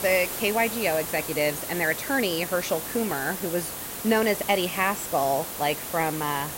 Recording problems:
hiss; loud; throughout; 6 dB below the speech

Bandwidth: 16 kHz